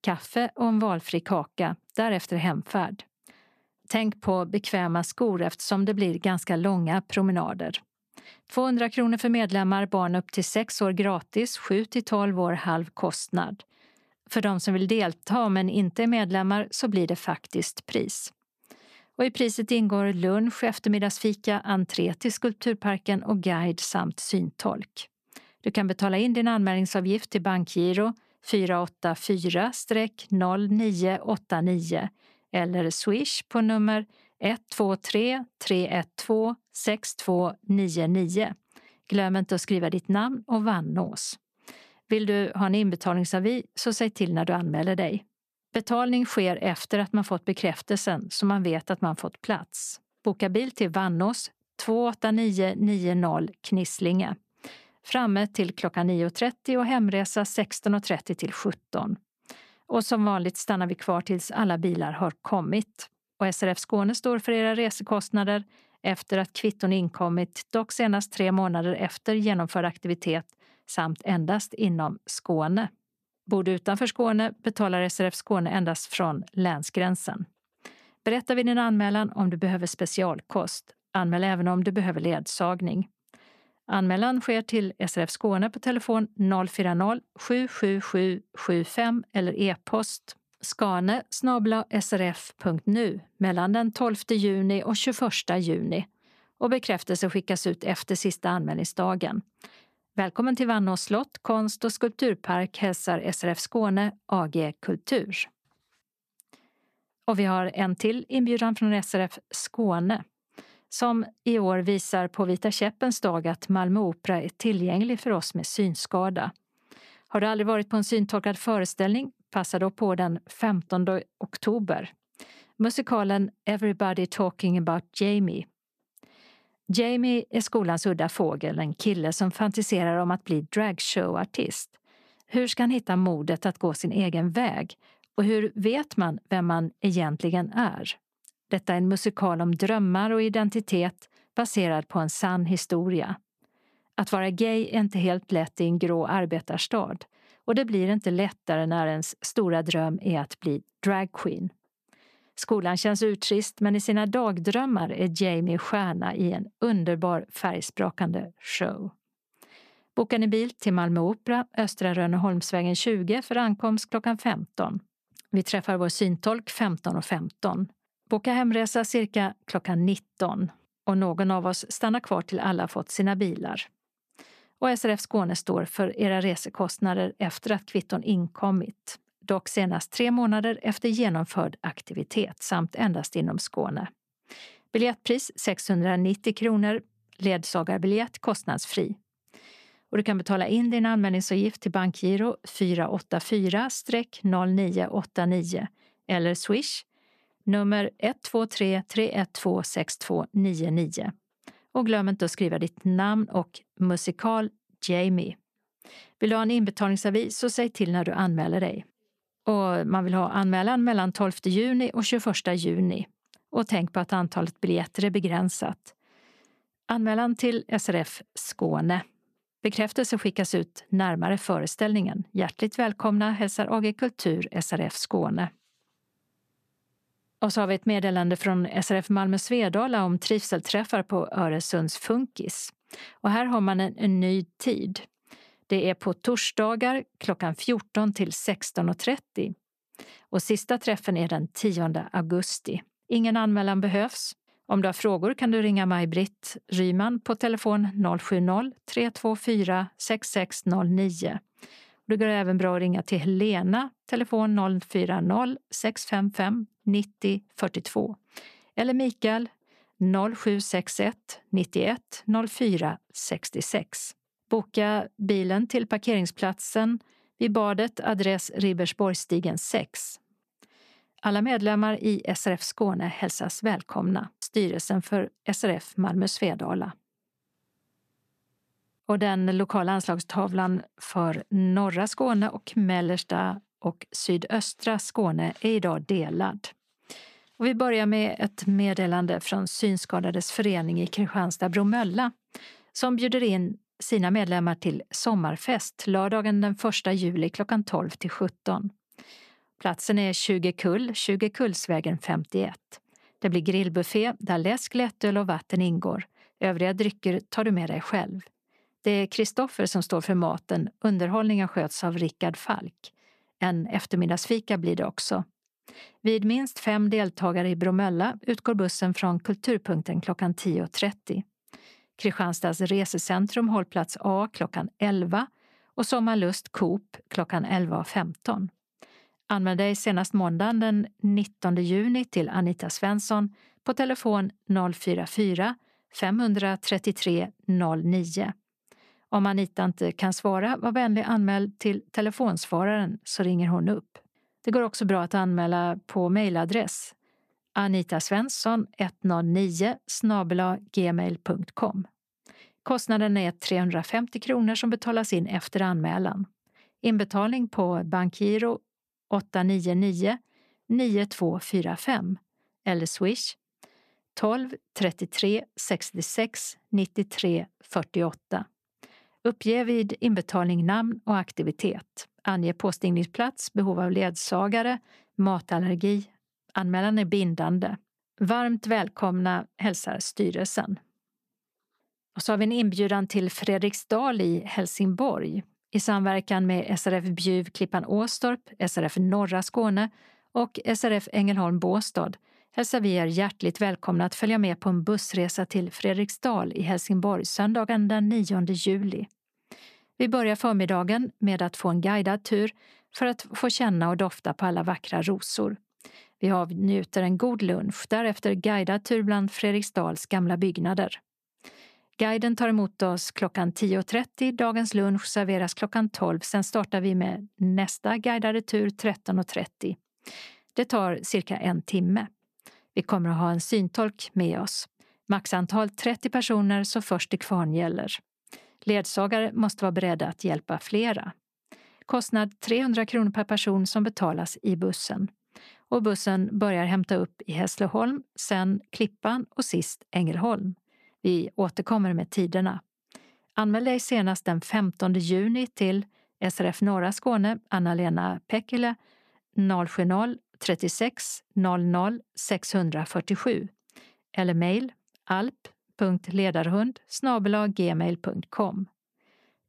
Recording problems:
none

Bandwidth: 14.5 kHz